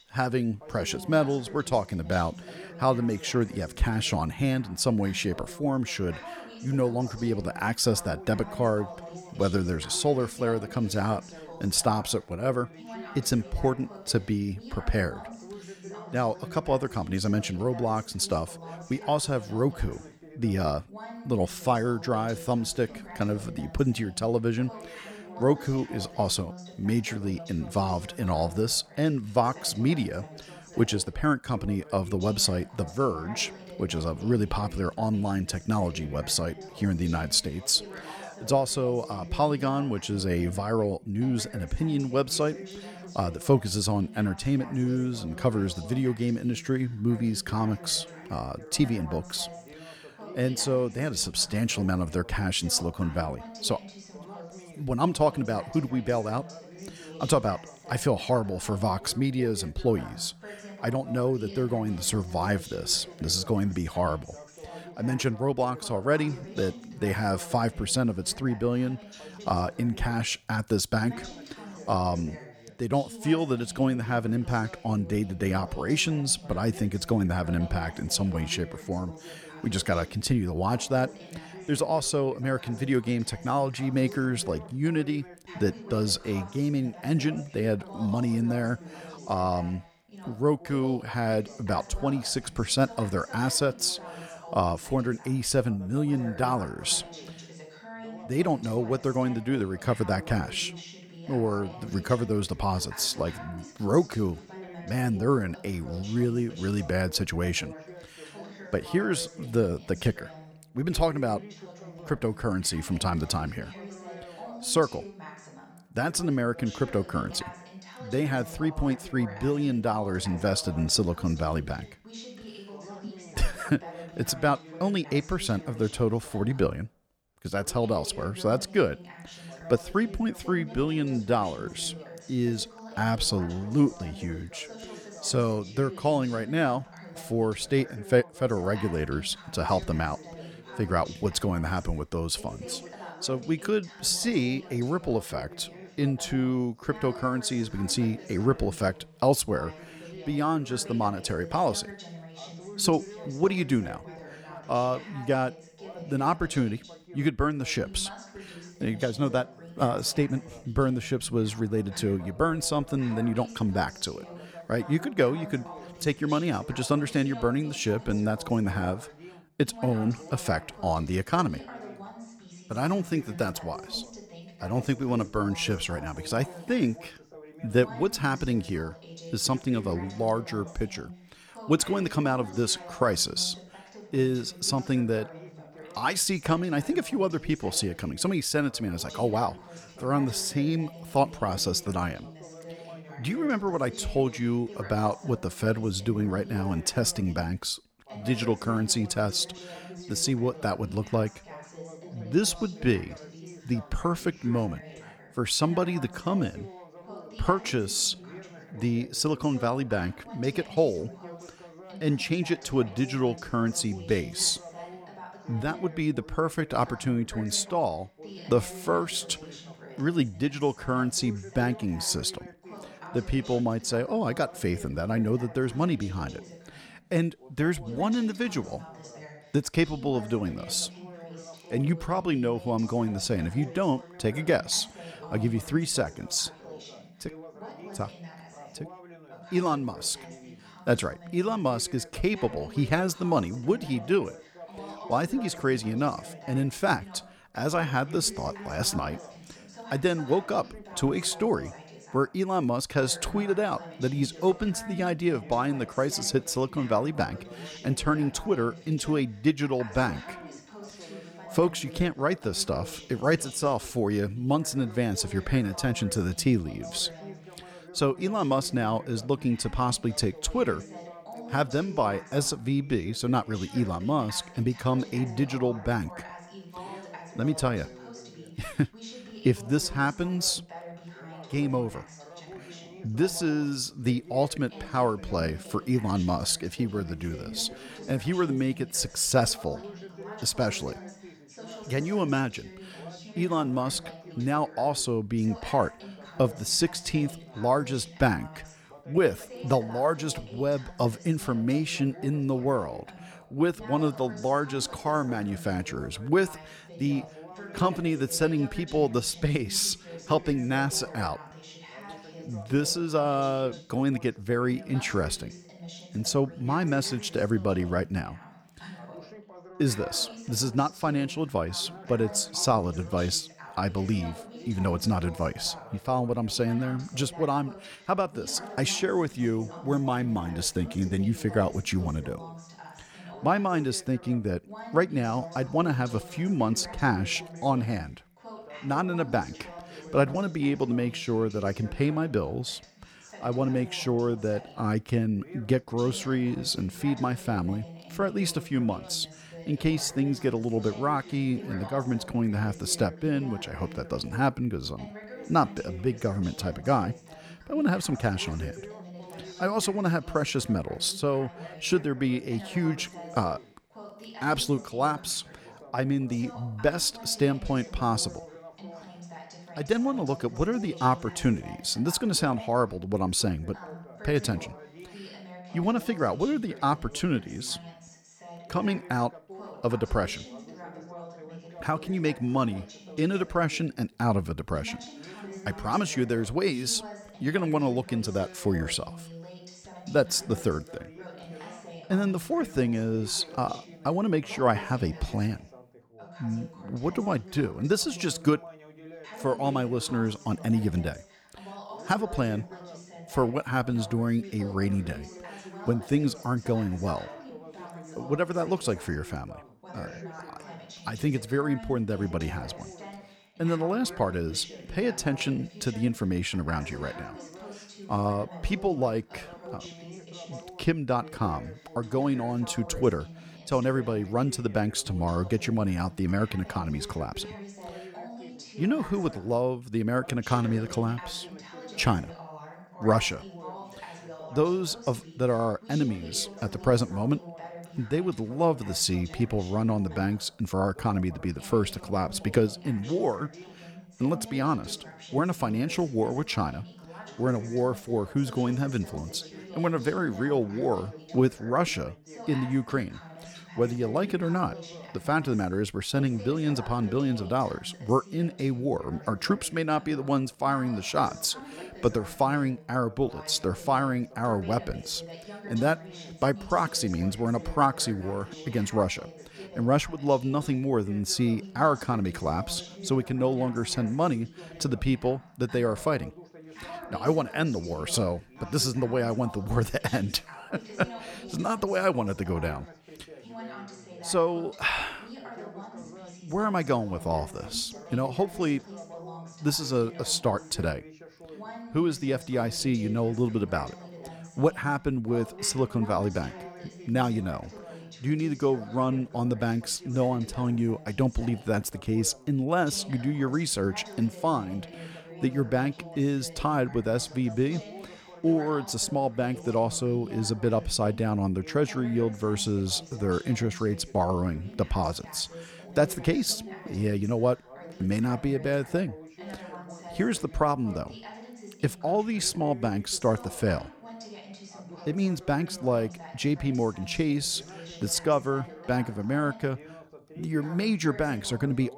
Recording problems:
background chatter; noticeable; throughout; 2 voices, 15 dB below the speech

